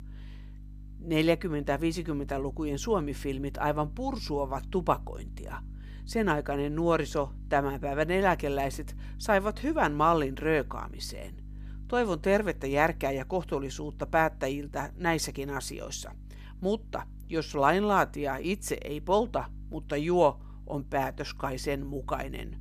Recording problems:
electrical hum; faint; throughout; 50 Hz, 30 dB below the speech

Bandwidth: 14 kHz